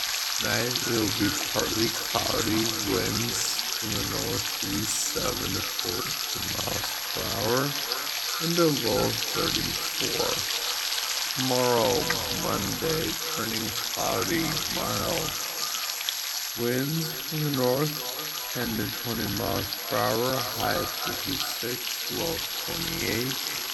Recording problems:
echo of what is said; strong; throughout; 380 ms later, 10 dB below the speech
wrong speed, natural pitch; too slow; 0.5 times normal speed
household noises; very loud; throughout; 2 dB above the speech
high-pitched whine; loud; throughout; 11.5 kHz, 6 dB below the speech

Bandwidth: 18 kHz